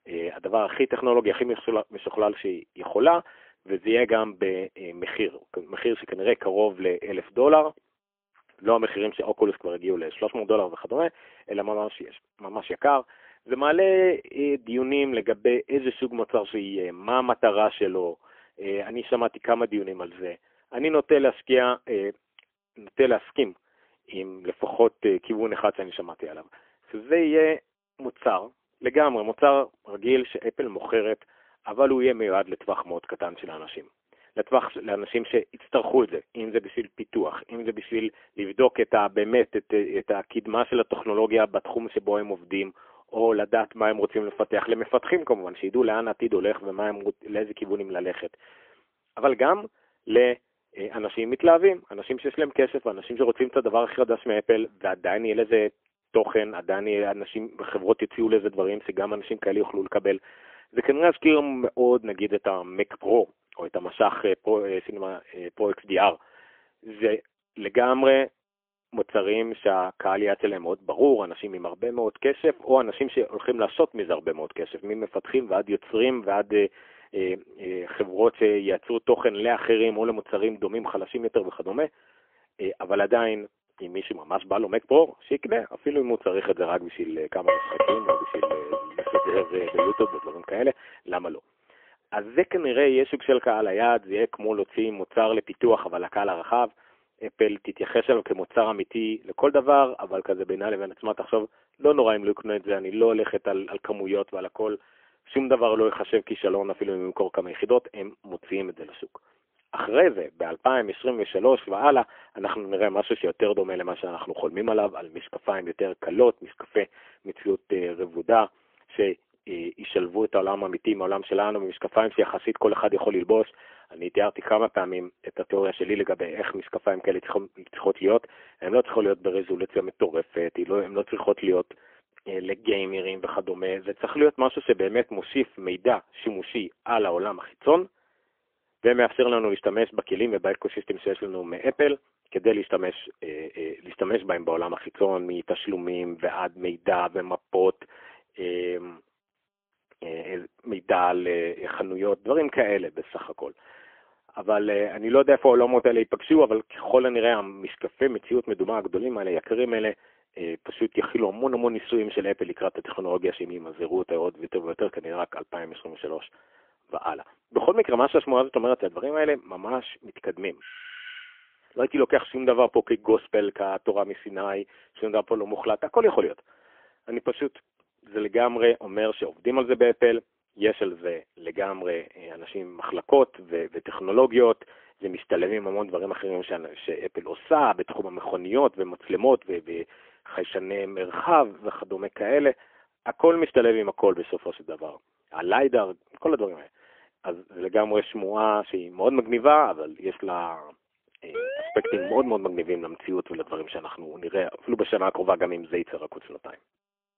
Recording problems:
phone-call audio; poor line; nothing above 3.5 kHz
clattering dishes; loud; from 1:27 to 1:30; peak 3 dB above the speech
doorbell; faint; at 2:51; peak 15 dB below the speech
siren; noticeable; at 3:21; peak 7 dB below the speech

